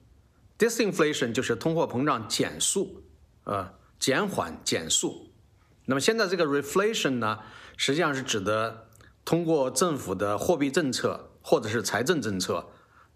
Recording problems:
squashed, flat; somewhat

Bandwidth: 14.5 kHz